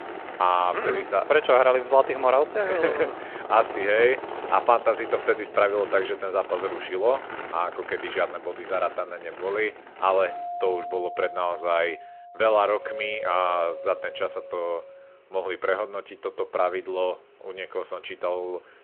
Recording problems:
phone-call audio
traffic noise; noticeable; throughout; 10 dB below the speech
doorbell; noticeable; from 10 to 15 s; peak 8 dB below the speech

